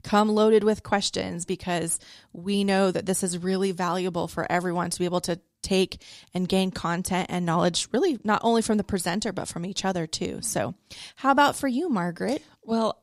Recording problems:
none

